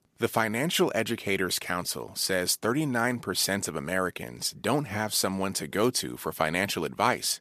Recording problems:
none

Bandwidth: 14.5 kHz